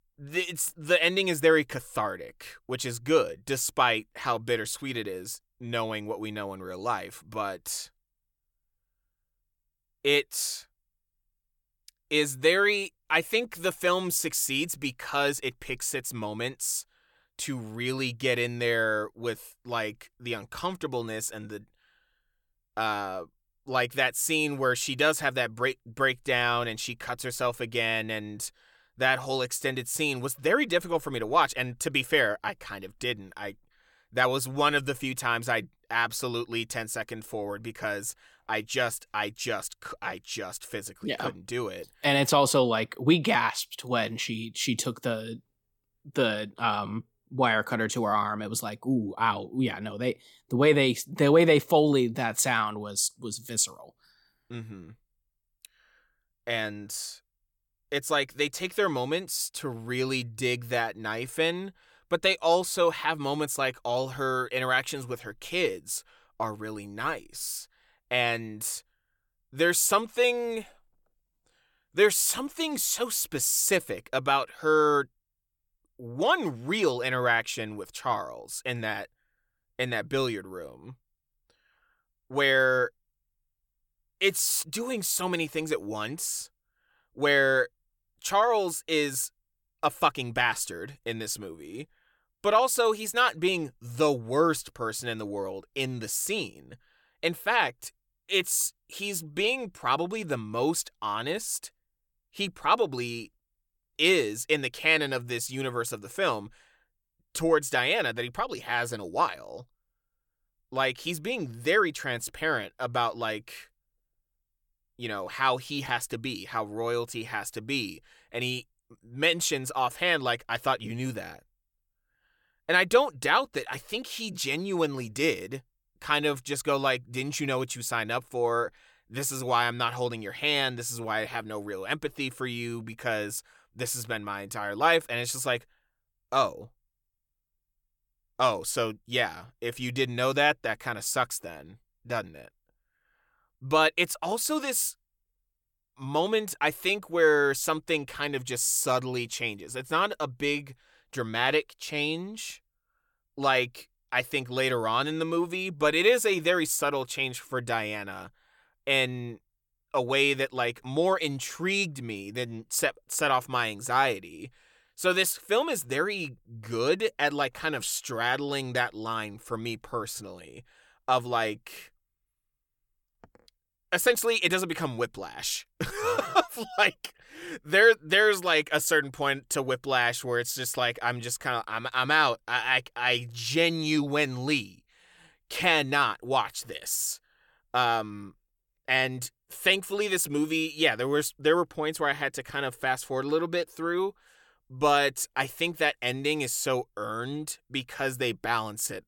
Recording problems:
none

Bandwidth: 17 kHz